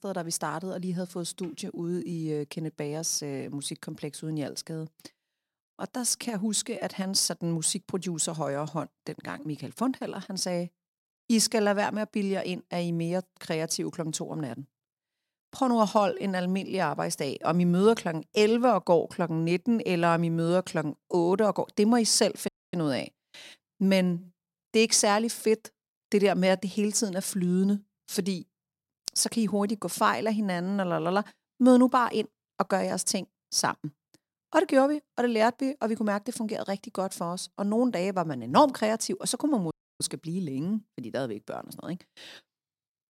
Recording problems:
audio cutting out; at 22 s and at 40 s

